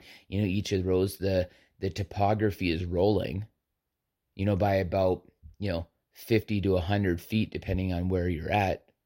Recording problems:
none

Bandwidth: 16 kHz